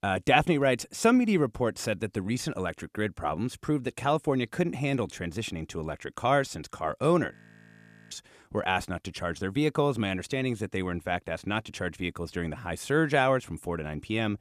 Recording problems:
audio freezing; at 7.5 s for 1 s

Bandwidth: 14 kHz